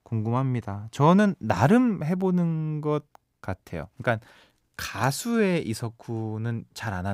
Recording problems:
abrupt cut into speech; at the end

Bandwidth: 15.5 kHz